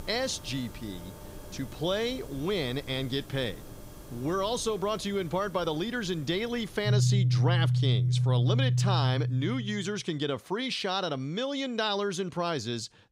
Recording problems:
background music; very loud; until 9.5 s; 4 dB above the speech

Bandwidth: 15.5 kHz